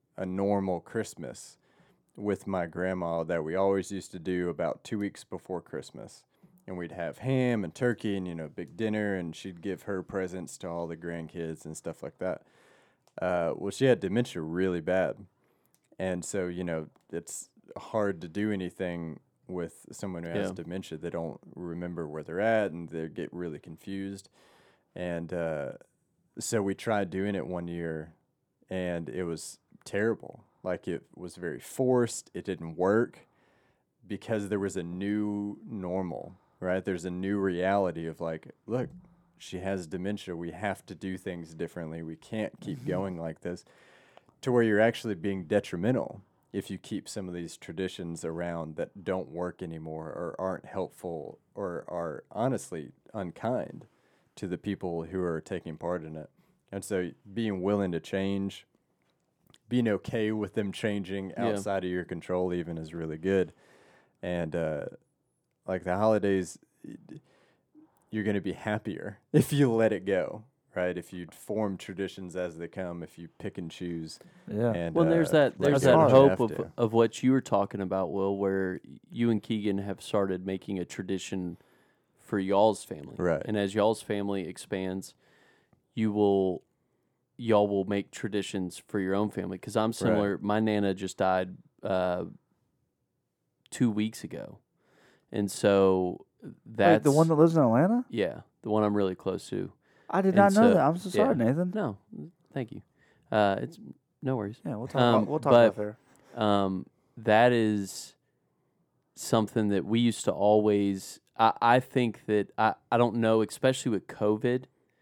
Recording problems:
none

